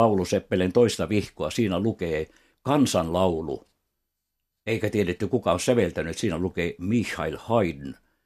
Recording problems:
abrupt cut into speech; at the start

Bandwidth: 13.5 kHz